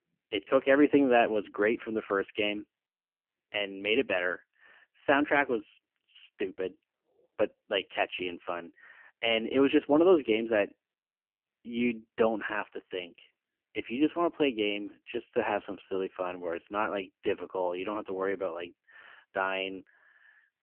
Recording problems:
phone-call audio; poor line; nothing above 3 kHz

